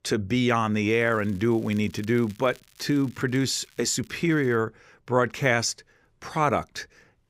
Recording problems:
crackling; faint; from 1 to 4.5 s; 30 dB below the speech

